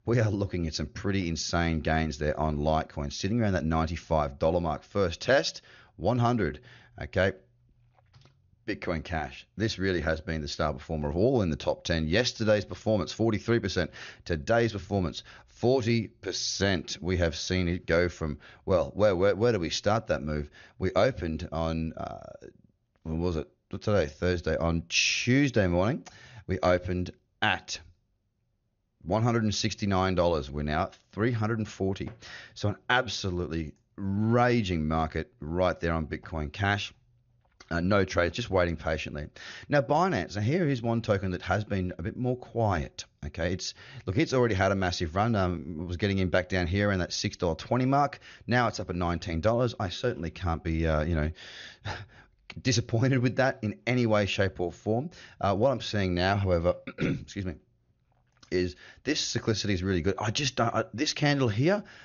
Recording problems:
high frequencies cut off; noticeable; nothing above 6.5 kHz

